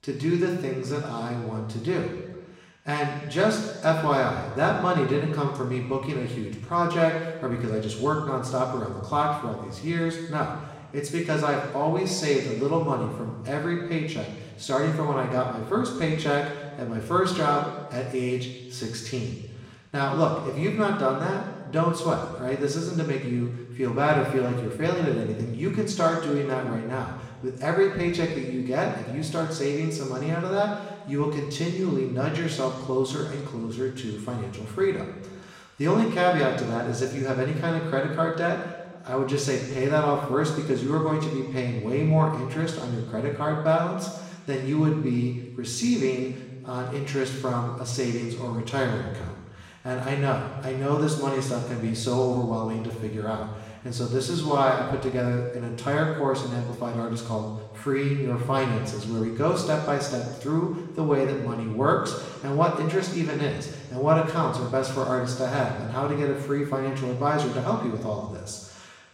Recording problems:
off-mic speech; far
room echo; noticeable; dies away in 1.2 s

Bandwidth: 16 kHz